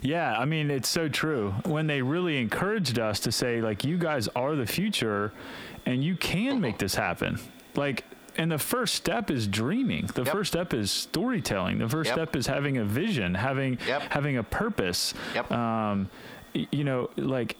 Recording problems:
squashed, flat; heavily
echo of what is said; faint; throughout; 450 ms later, 25 dB below the speech

